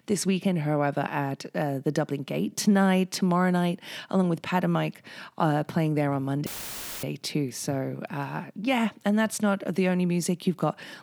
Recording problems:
audio cutting out; filled with static; at 6.5 s for 0.5 s

